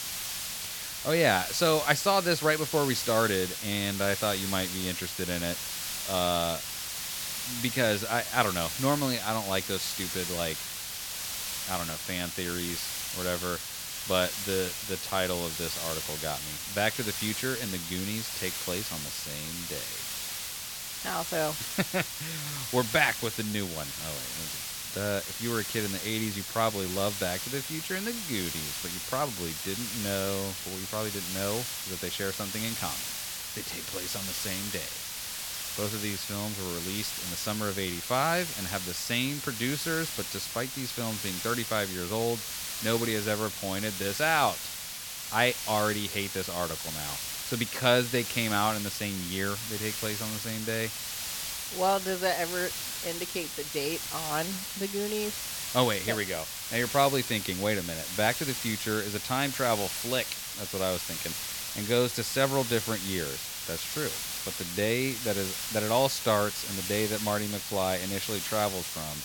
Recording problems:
hiss; loud; throughout; 3 dB below the speech

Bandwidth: 17 kHz